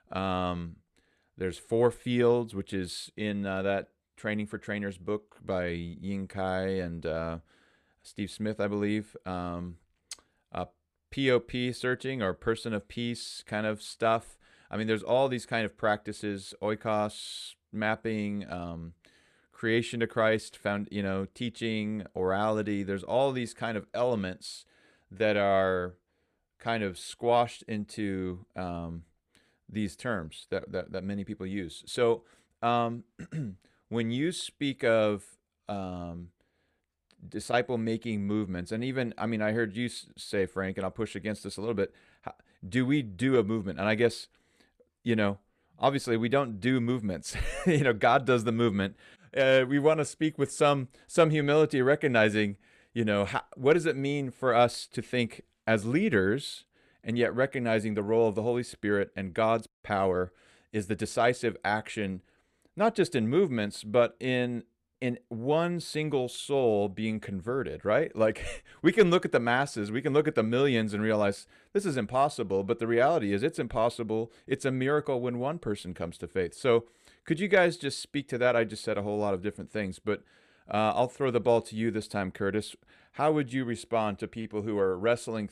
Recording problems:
none

